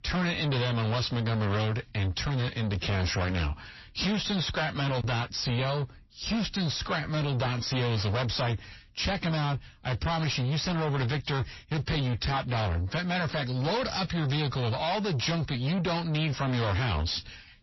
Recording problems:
distortion; heavy; 6 dB below the speech
garbled, watery; slightly; nothing above 5.5 kHz

